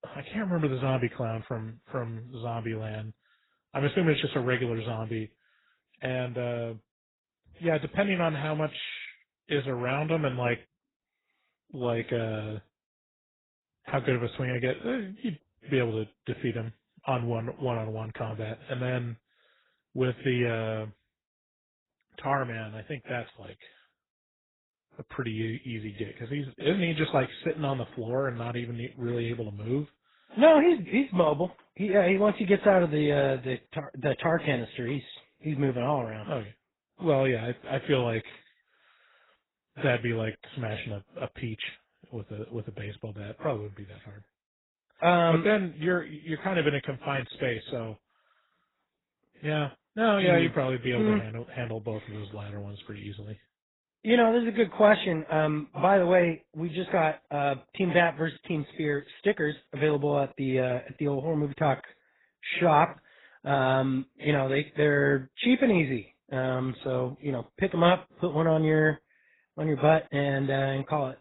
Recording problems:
garbled, watery; badly; nothing above 4 kHz

